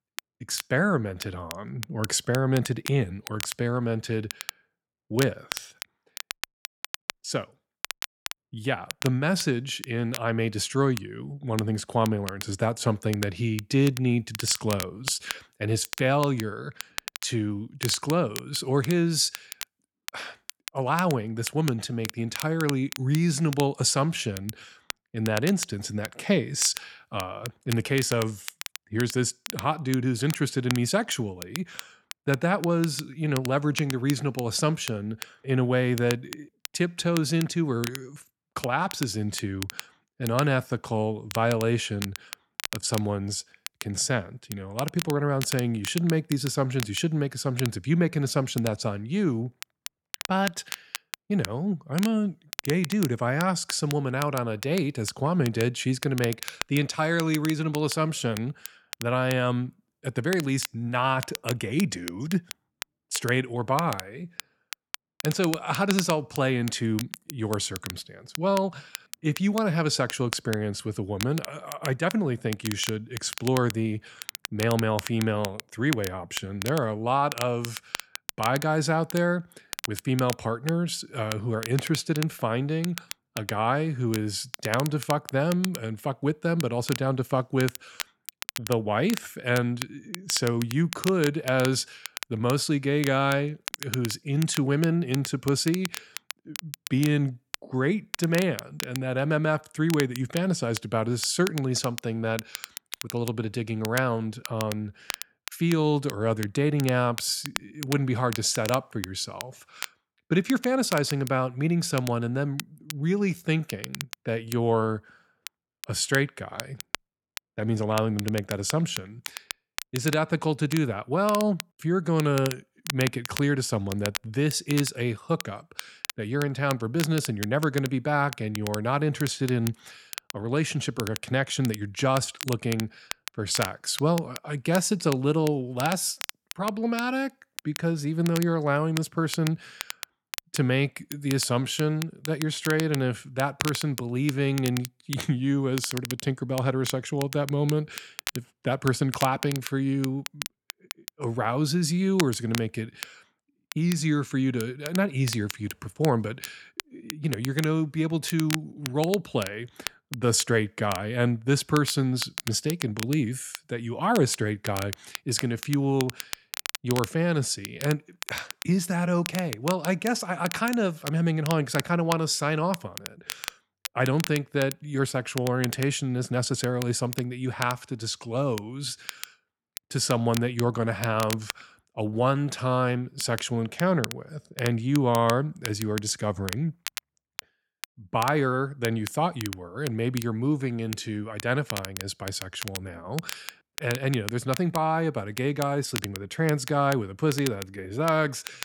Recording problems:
crackle, like an old record; noticeable; 10 dB below the speech

